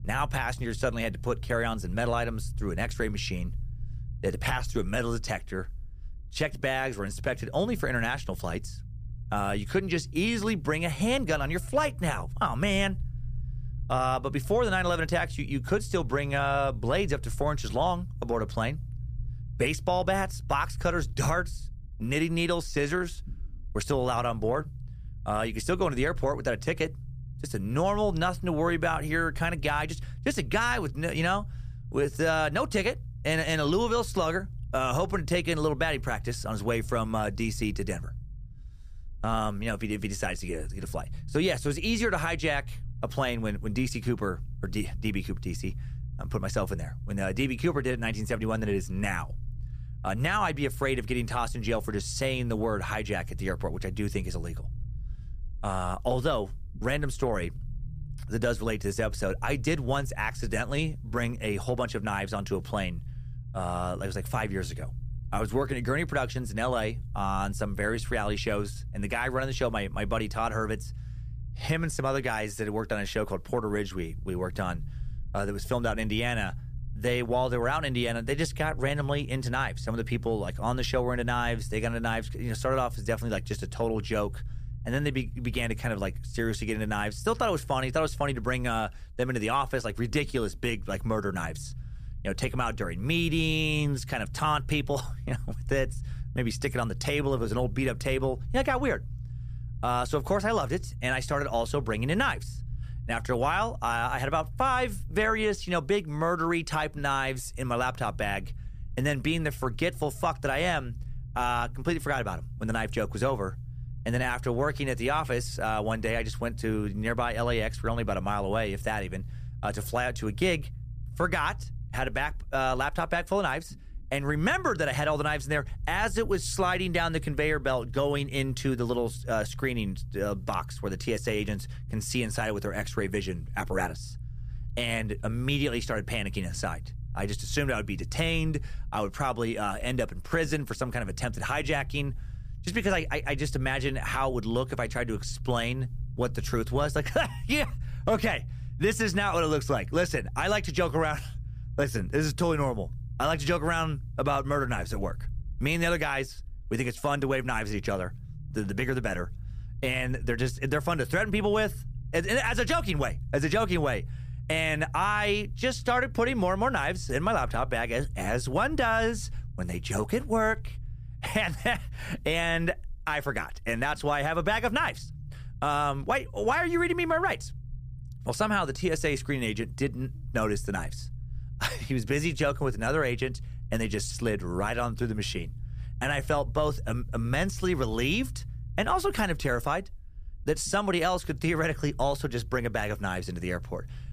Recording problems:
low rumble; faint; throughout; 25 dB below the speech

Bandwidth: 15 kHz